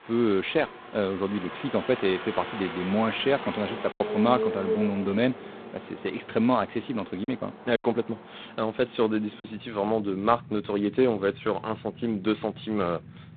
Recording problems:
phone-call audio; poor line; nothing above 4 kHz
traffic noise; noticeable; throughout; 10 dB below the speech
choppy; occasionally; 2% of the speech affected

